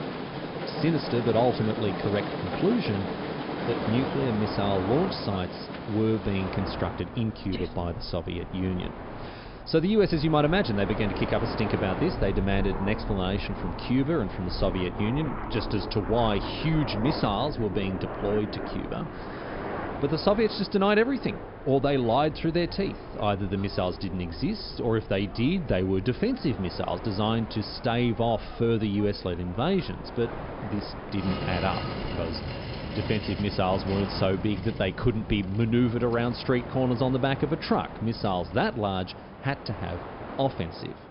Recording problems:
high frequencies cut off; noticeable; nothing above 5.5 kHz
train or aircraft noise; loud; throughout; 8 dB below the speech

